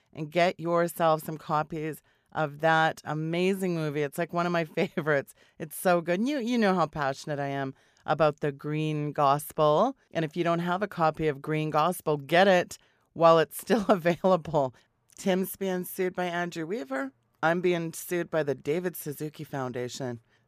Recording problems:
none

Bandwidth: 15 kHz